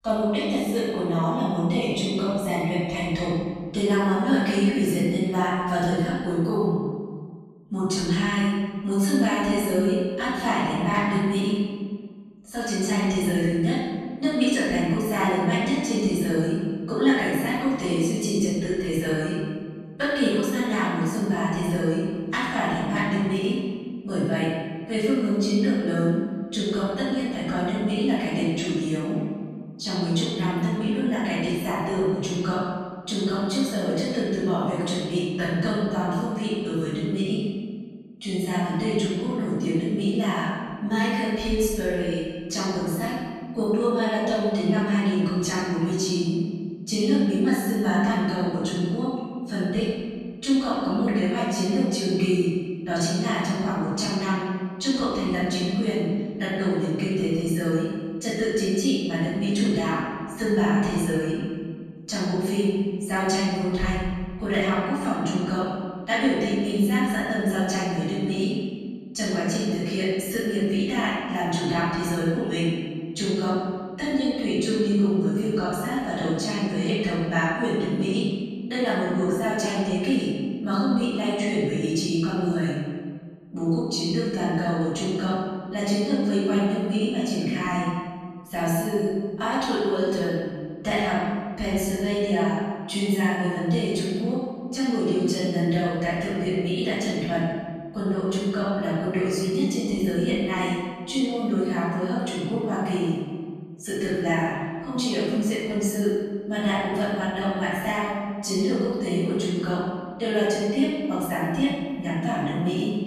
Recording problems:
room echo; strong; dies away in 1.6 s
off-mic speech; far

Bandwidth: 13.5 kHz